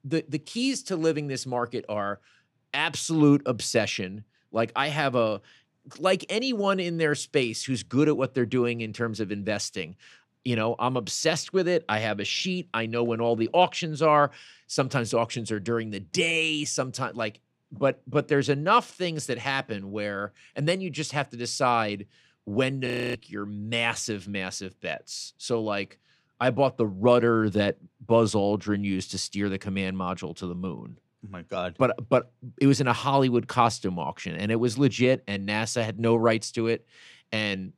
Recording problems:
audio freezing; at 23 s

